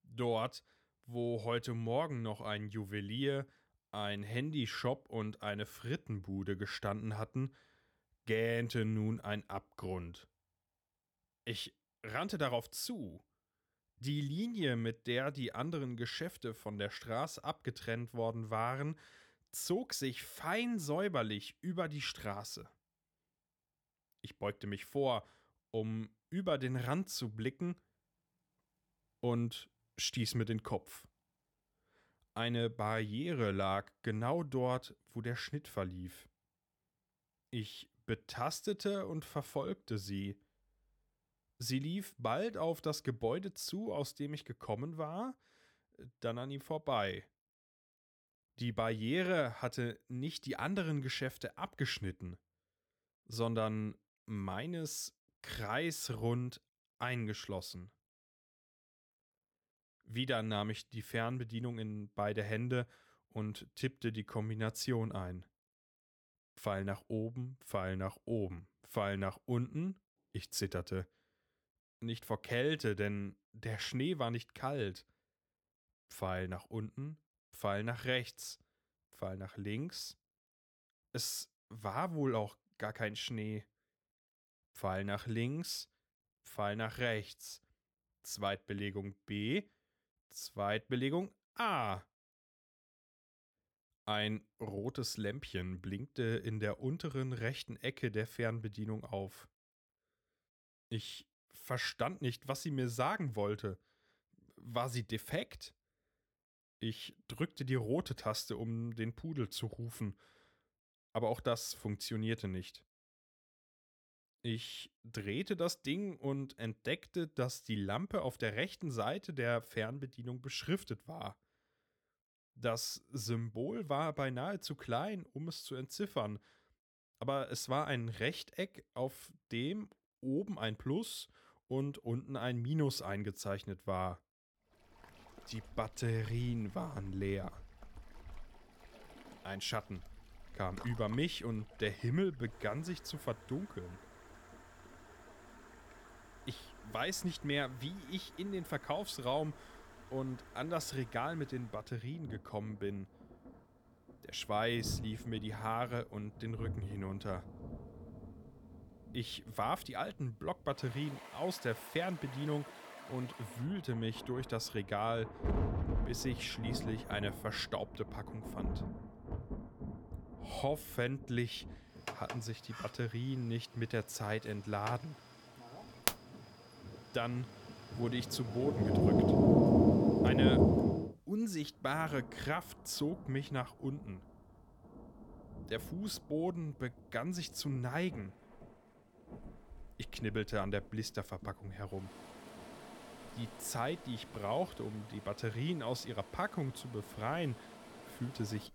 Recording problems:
rain or running water; very loud; from 2:15 on; 4 dB above the speech

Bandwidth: 18.5 kHz